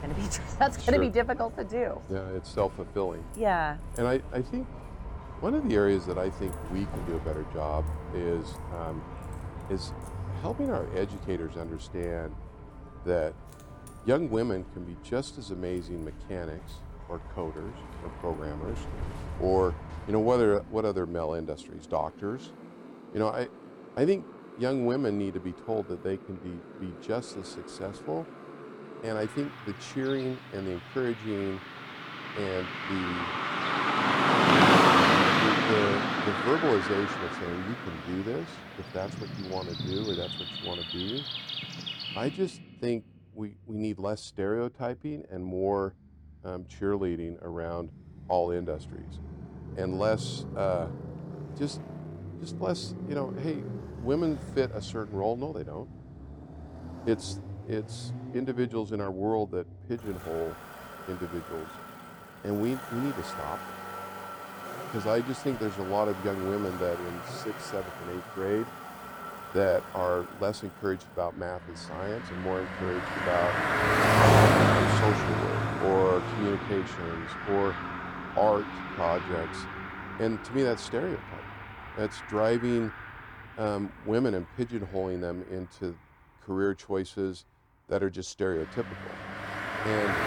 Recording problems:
traffic noise; very loud; throughout; 1 dB above the speech

